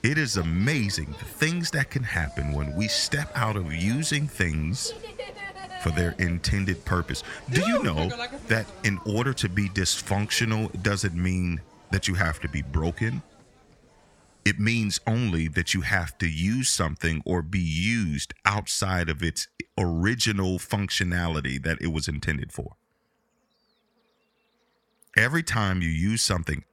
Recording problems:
animal sounds; noticeable; throughout; 15 dB below the speech

